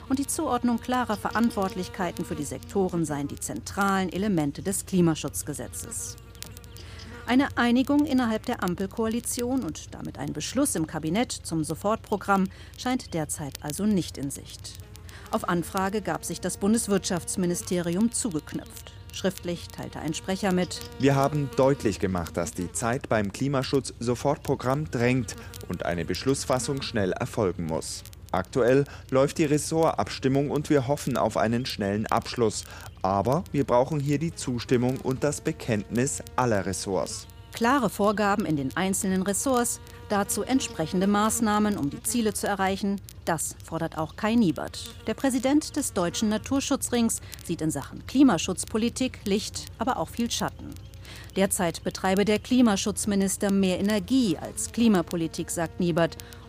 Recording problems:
electrical hum; faint; throughout; 60 Hz, 20 dB below the speech
crackle, like an old record; faint; 25 dB below the speech

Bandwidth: 15 kHz